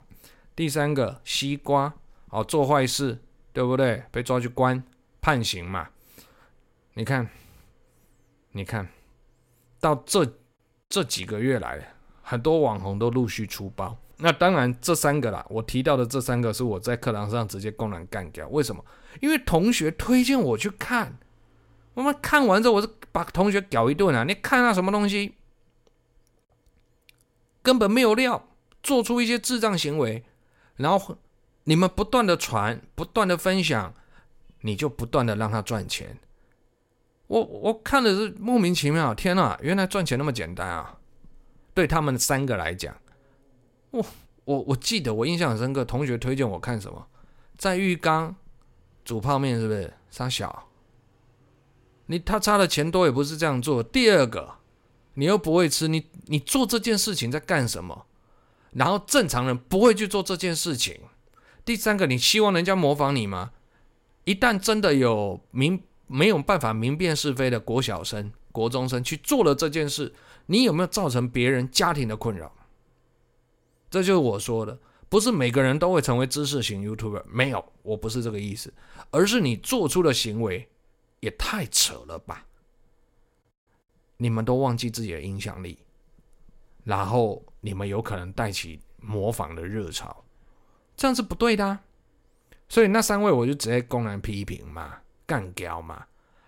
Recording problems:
none

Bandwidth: 16 kHz